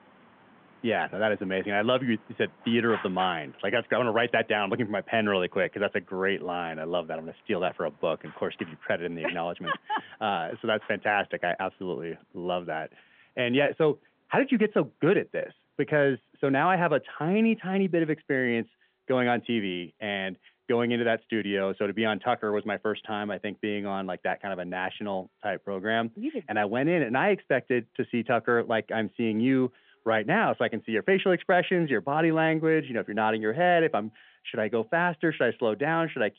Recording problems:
phone-call audio; nothing above 3.5 kHz
traffic noise; faint; throughout; 20 dB below the speech

